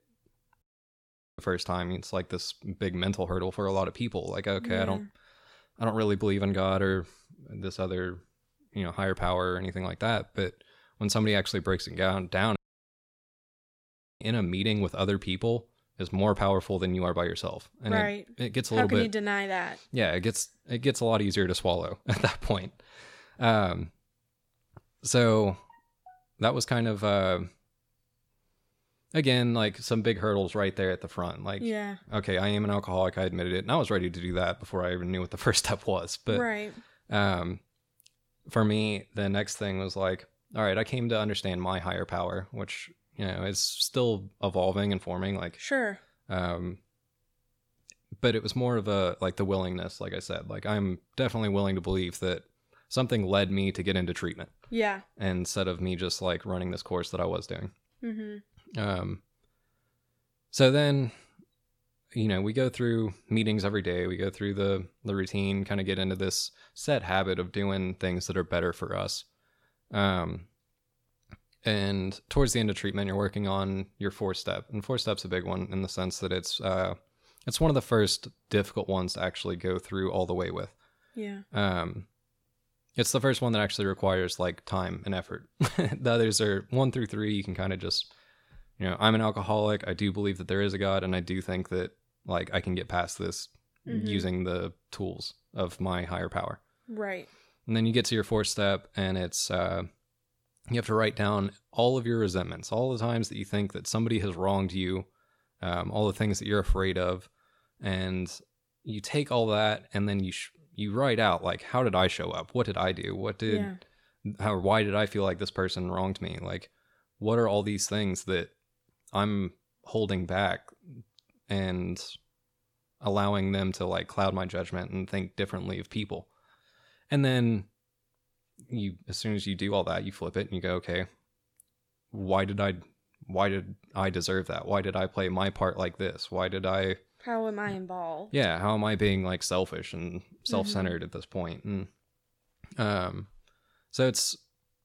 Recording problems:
audio cutting out; at 0.5 s for 1 s and at 13 s for 1.5 s

